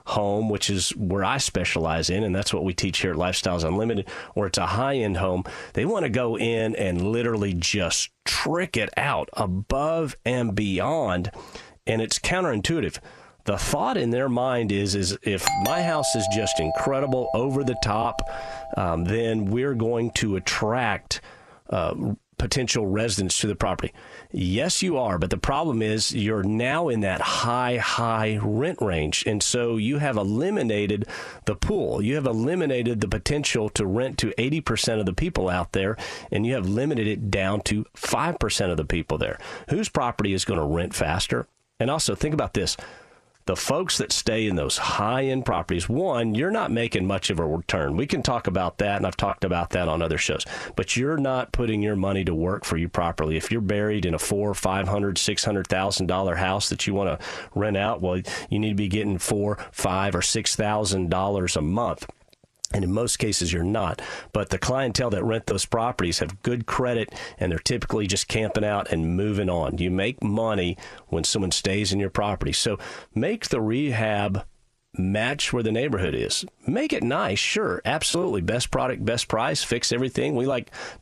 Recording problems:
squashed, flat; heavily
doorbell; loud; from 15 to 19 s; peak 1 dB above the speech

